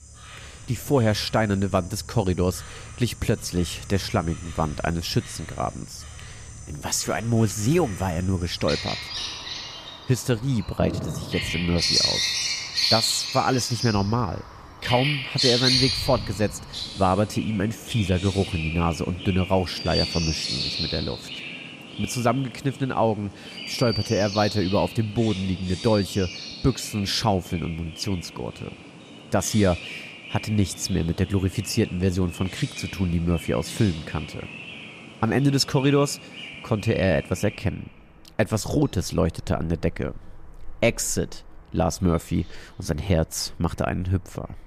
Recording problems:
animal sounds; loud; throughout; 4 dB below the speech

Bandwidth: 14.5 kHz